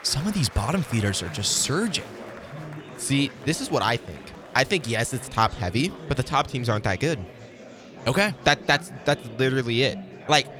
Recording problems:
murmuring crowd; noticeable; throughout; 15 dB below the speech

